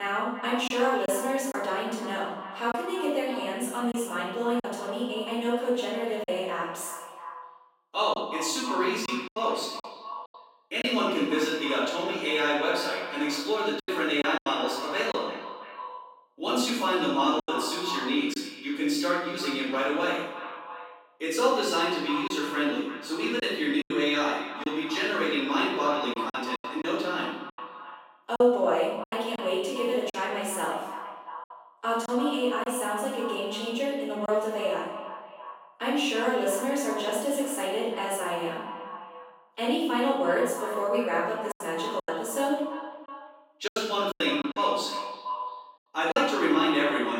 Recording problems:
echo of what is said; strong; throughout; 340 ms later, 10 dB below the speech
off-mic speech; far
room echo; noticeable; dies away in 0.8 s
thin; very slightly; fading below 250 Hz
choppy; occasionally; 4% of the speech affected
abrupt cut into speech; at the start and the end

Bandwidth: 16 kHz